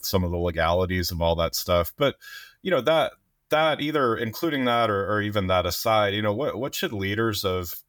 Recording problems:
none

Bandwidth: 18 kHz